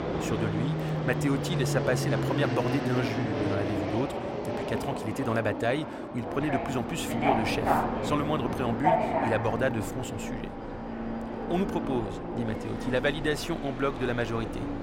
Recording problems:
train or aircraft noise; loud; throughout; as loud as the speech

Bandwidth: 16 kHz